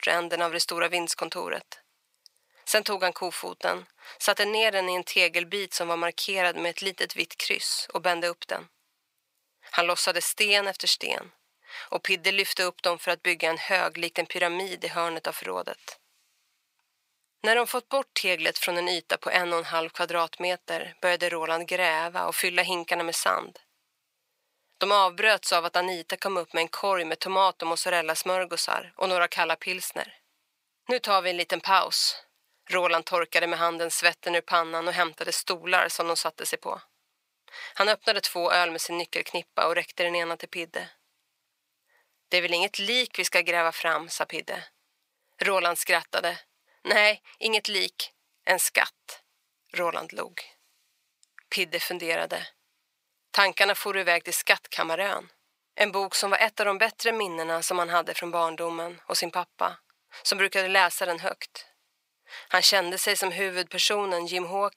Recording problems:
thin; very; fading below 800 Hz

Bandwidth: 15.5 kHz